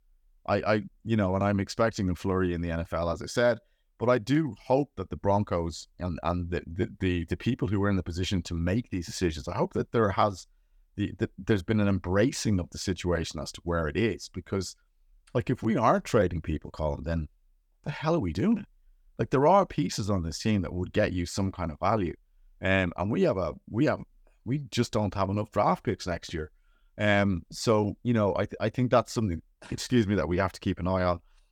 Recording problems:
none

